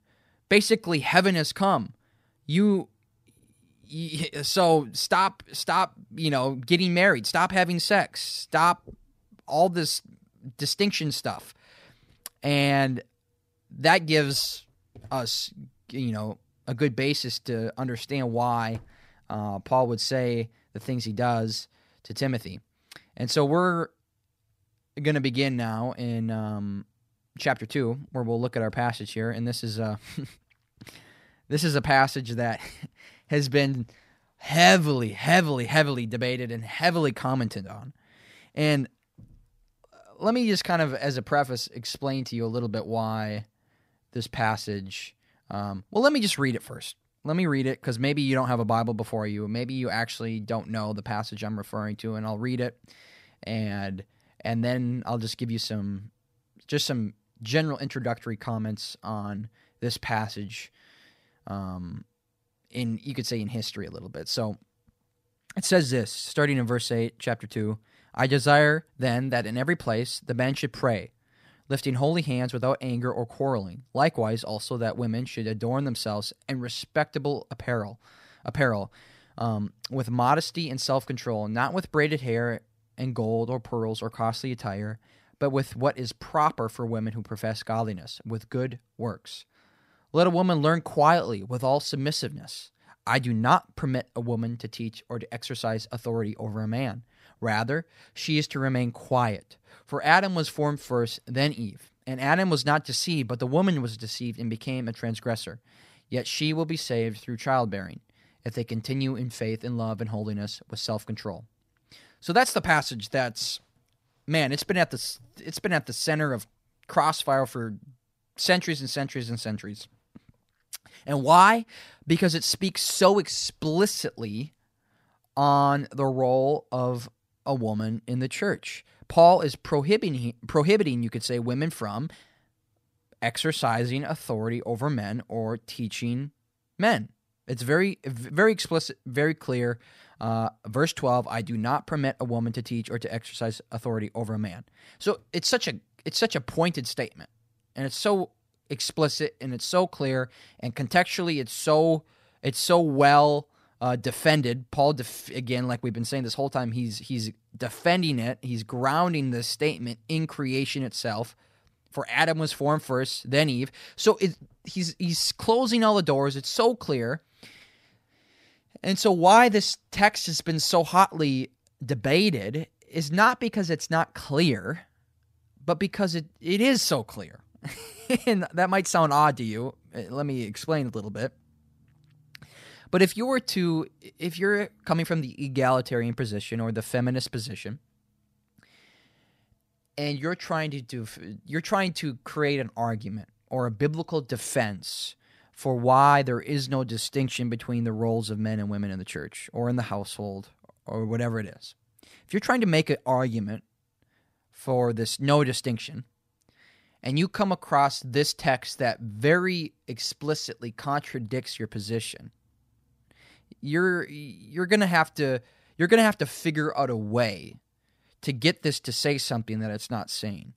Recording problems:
none

